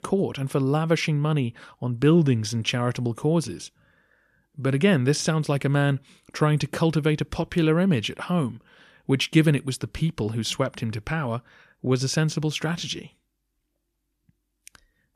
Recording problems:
none

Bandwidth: 14.5 kHz